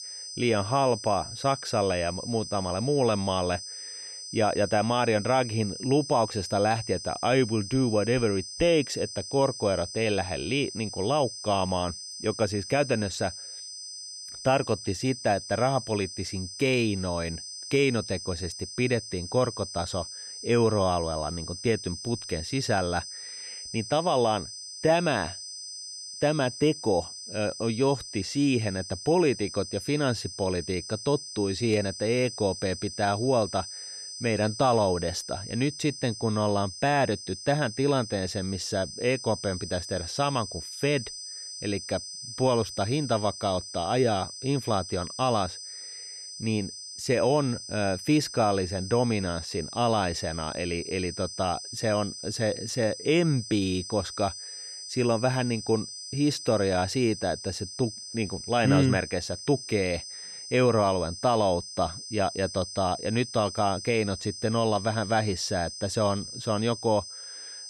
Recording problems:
high-pitched whine; loud; throughout; 5 kHz, 10 dB below the speech

